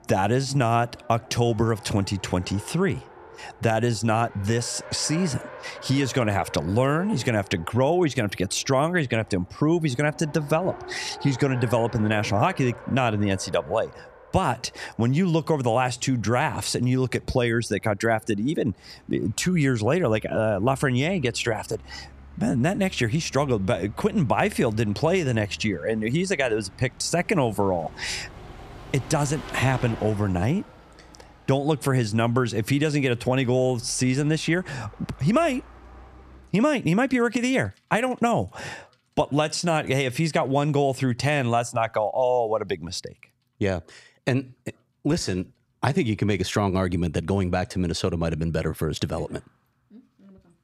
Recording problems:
traffic noise; noticeable; throughout; 20 dB below the speech

